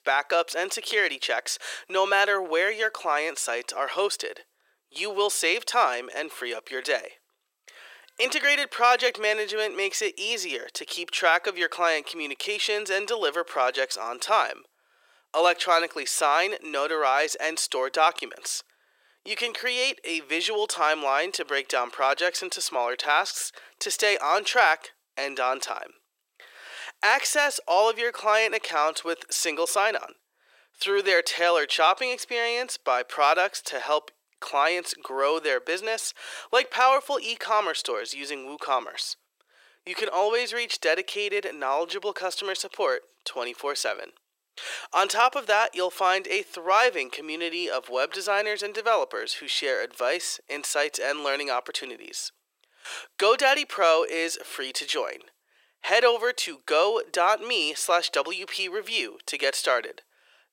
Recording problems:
thin; very; fading below 400 Hz

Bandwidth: 16 kHz